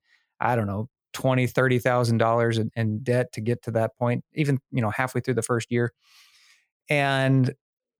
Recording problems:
none

